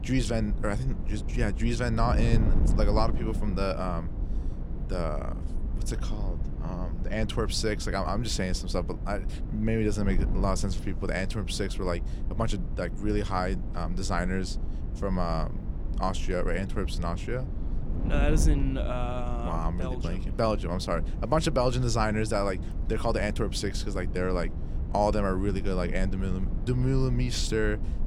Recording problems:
wind noise on the microphone; occasional gusts; 15 dB below the speech

